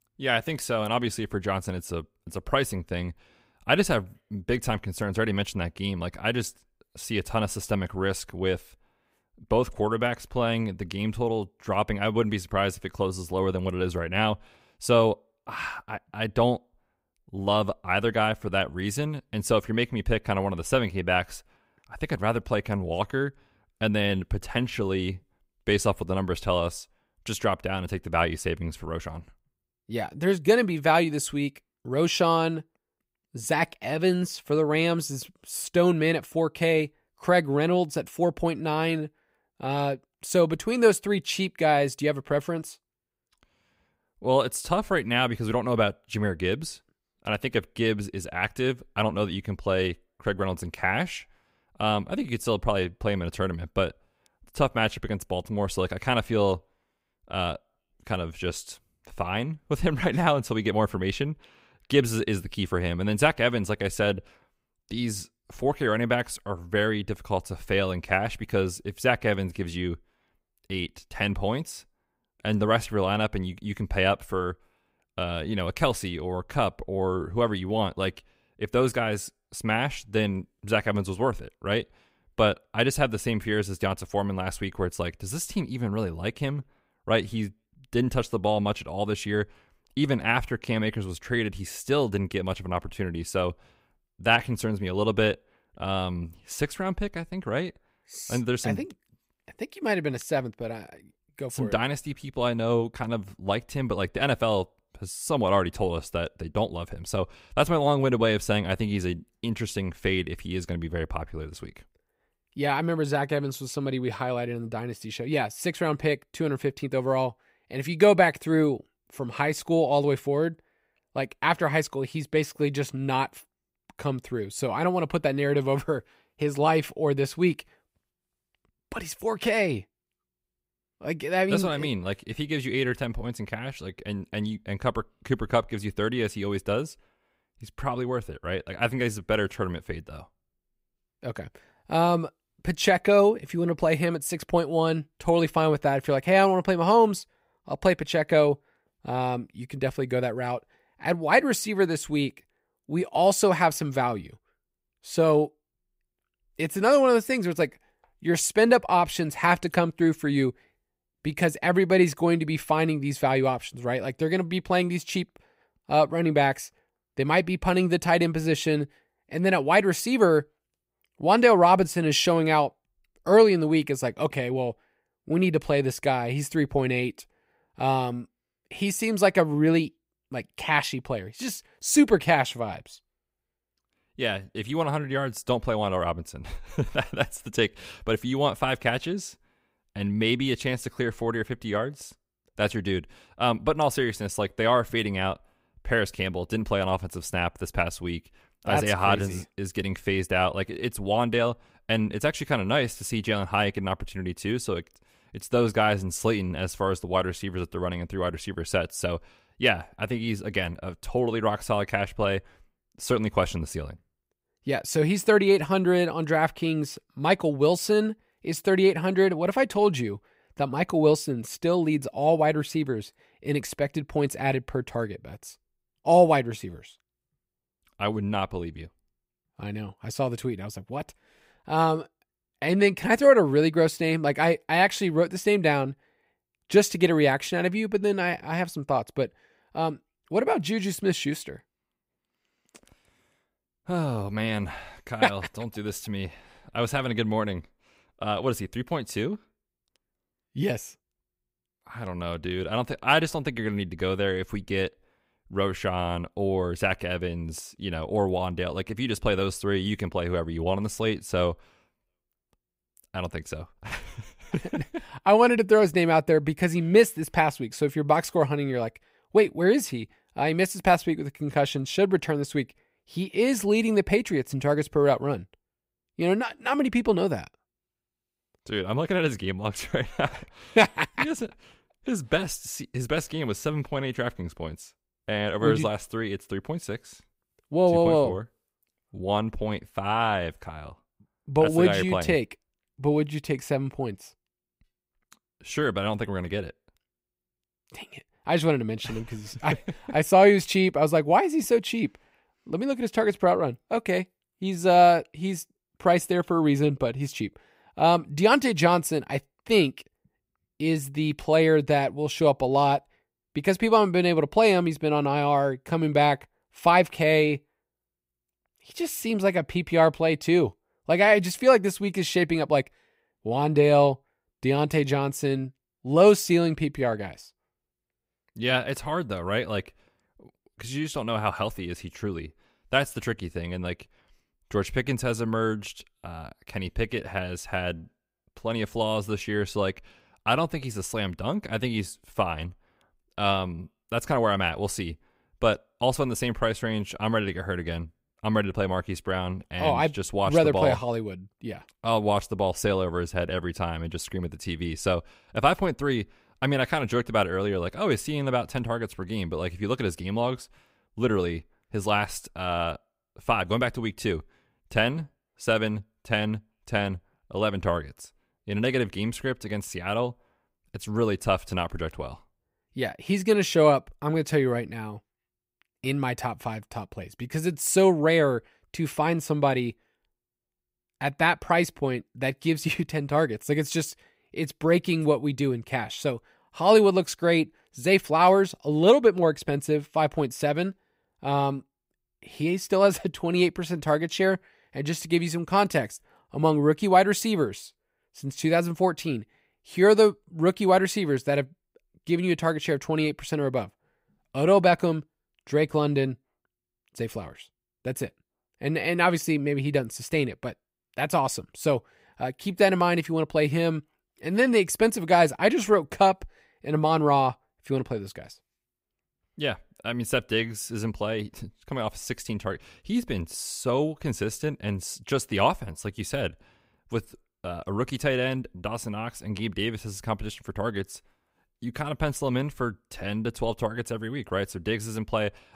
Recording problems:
none

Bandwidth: 15.5 kHz